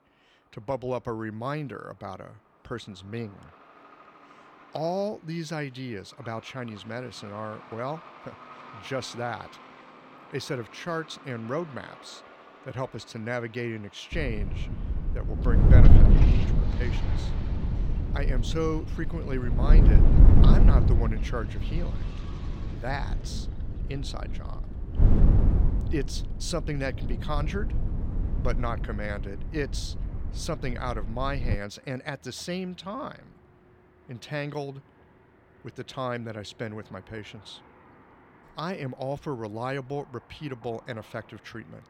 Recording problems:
wind noise on the microphone; heavy; from 14 to 32 s; 3 dB below the speech
traffic noise; noticeable; throughout; 15 dB below the speech

